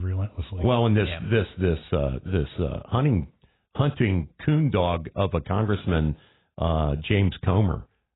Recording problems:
garbled, watery; badly; nothing above 4 kHz
abrupt cut into speech; at the start

